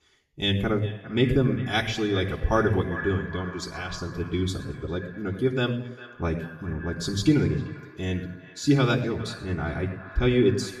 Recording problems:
off-mic speech; far
echo of what is said; noticeable; throughout; 400 ms later, 15 dB below the speech
room echo; slight; dies away in 0.7 s

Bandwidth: 13.5 kHz